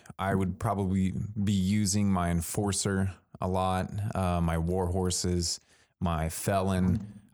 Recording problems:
none

